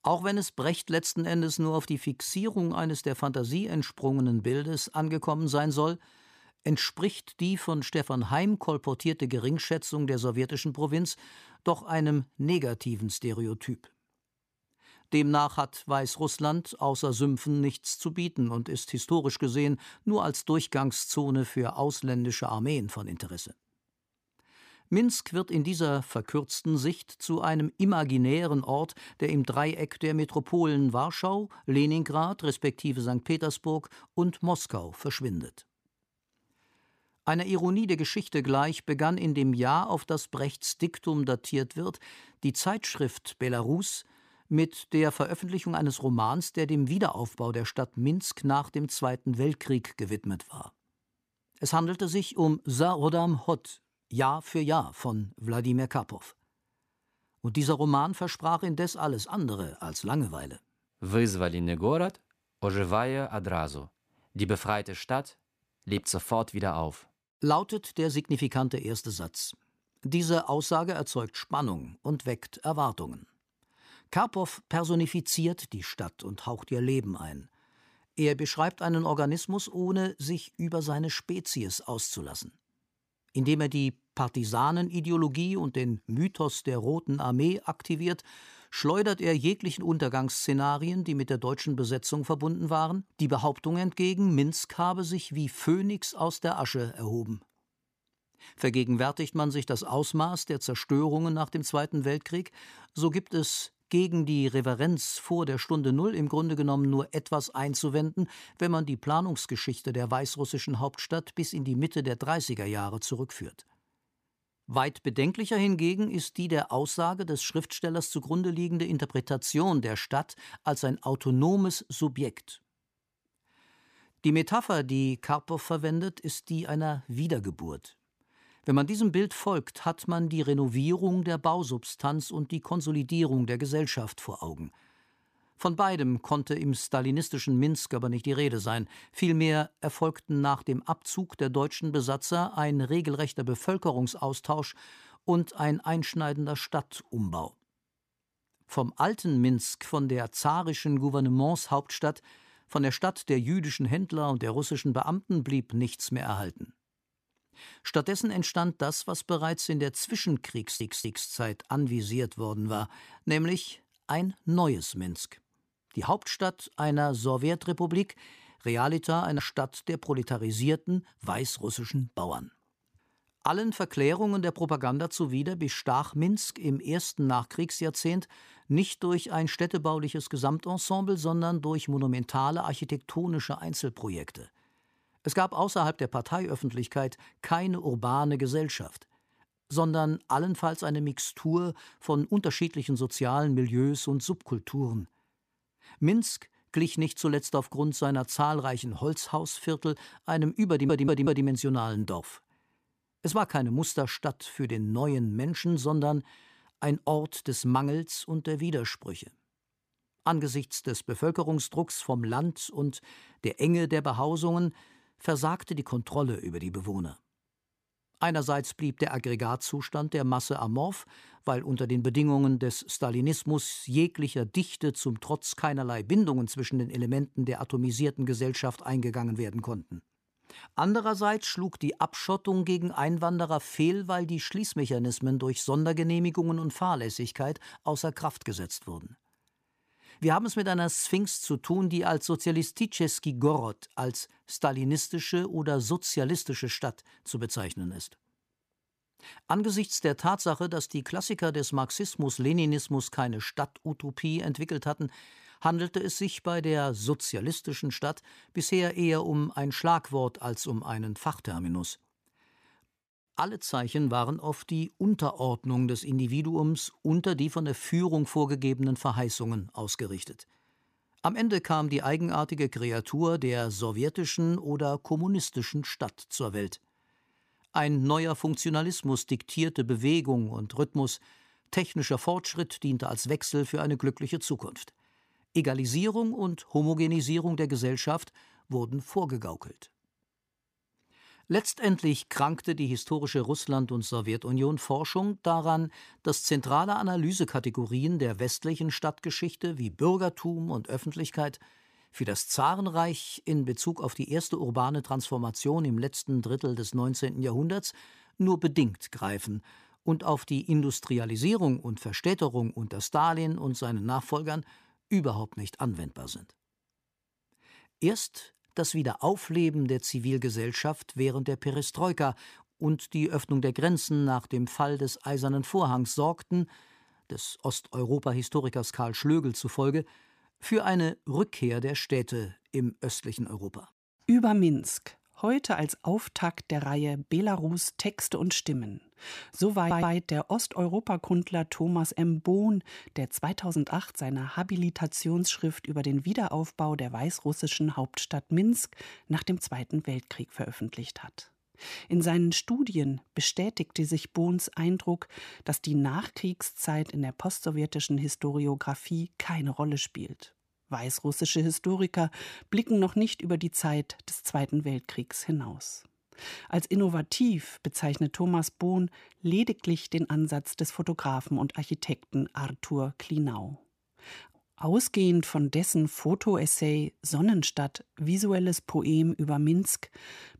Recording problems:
audio stuttering; at 2:41, at 3:21 and at 5:40

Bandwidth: 15 kHz